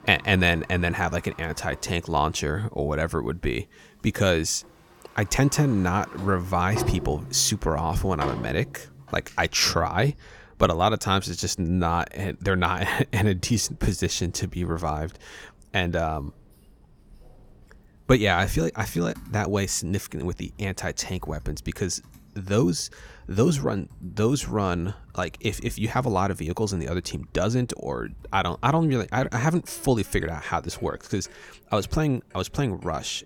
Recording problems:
household noises; noticeable; throughout; 20 dB below the speech

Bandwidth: 17 kHz